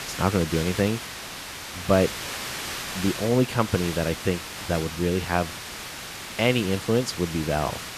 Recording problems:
hiss; loud; throughout; 8 dB below the speech

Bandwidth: 14.5 kHz